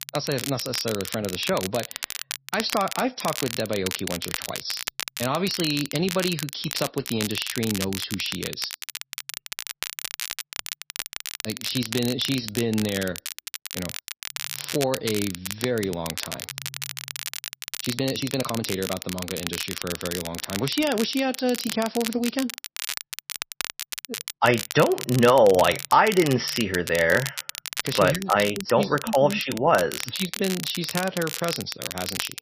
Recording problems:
garbled, watery; slightly; nothing above 5.5 kHz
crackle, like an old record; loud; 7 dB below the speech
uneven, jittery; strongly; from 15 to 31 s

